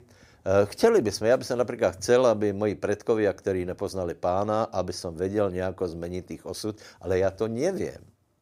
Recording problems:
none

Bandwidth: 15.5 kHz